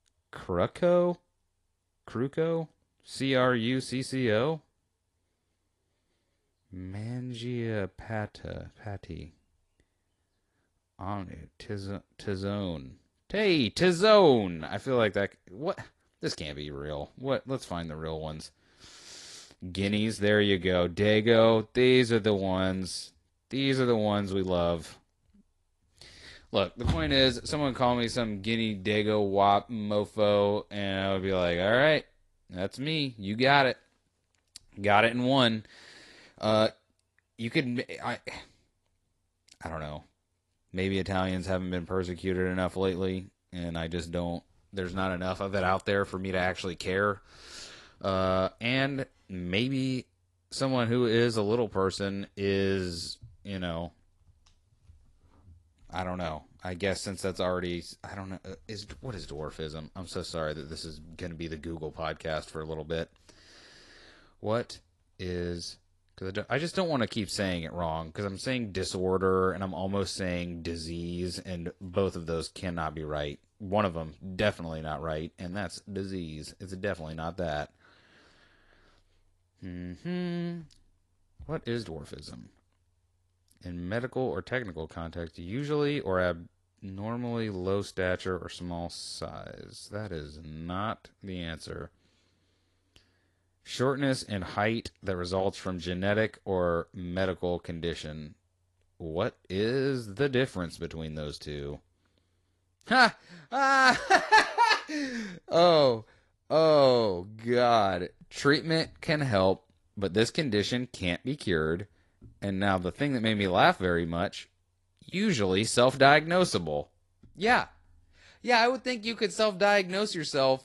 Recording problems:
garbled, watery; slightly; nothing above 11 kHz

